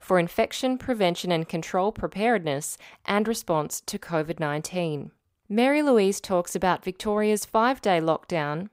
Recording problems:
none

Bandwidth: 15.5 kHz